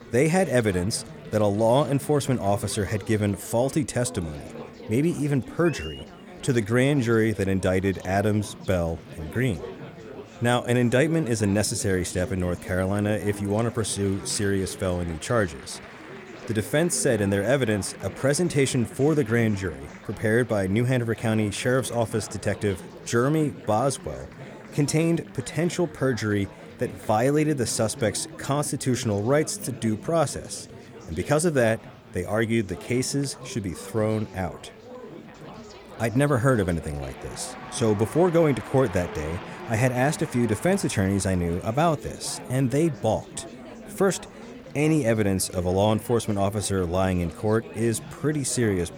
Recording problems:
chatter from many people; noticeable; throughout; 15 dB below the speech

